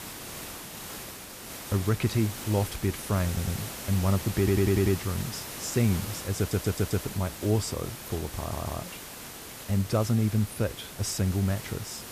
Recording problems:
hiss; loud; throughout; 9 dB below the speech
audio stuttering; 4 times, first at 3.5 s

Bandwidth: 14.5 kHz